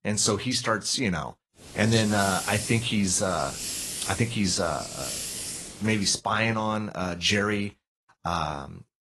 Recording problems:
garbled, watery; slightly
hiss; loud; from 1.5 to 6 s; 7 dB below the speech

